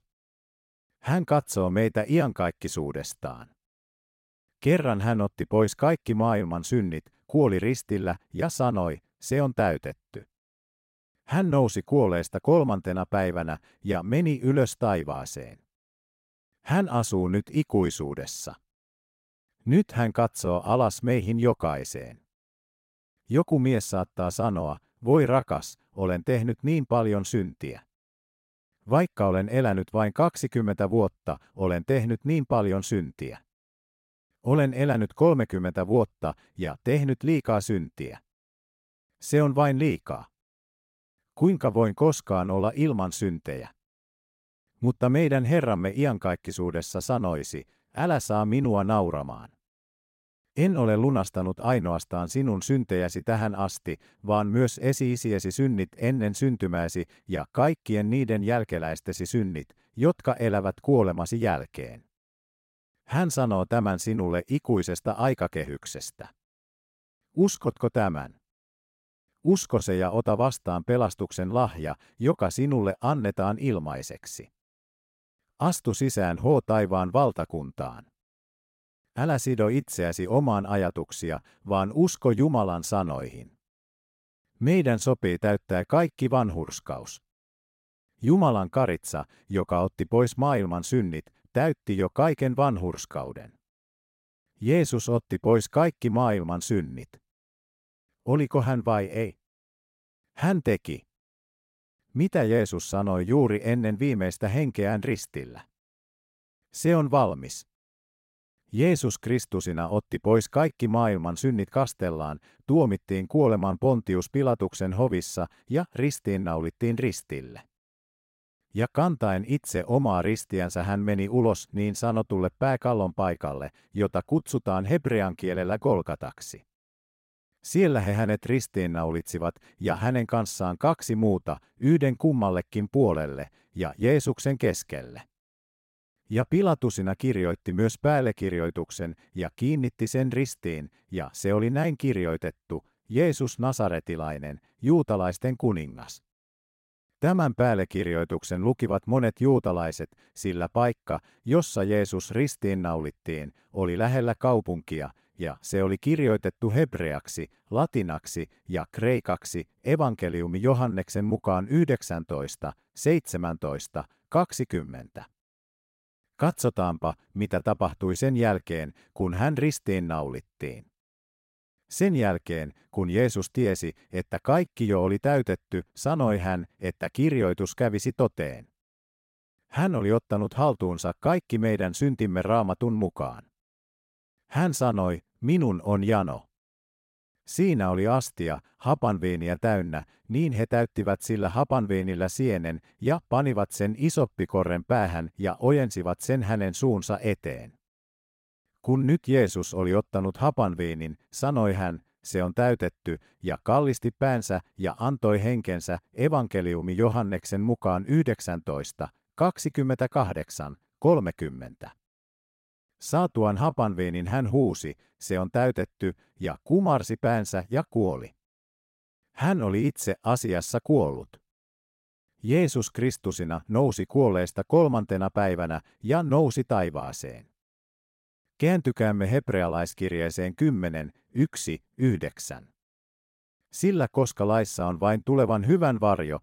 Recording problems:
none

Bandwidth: 16 kHz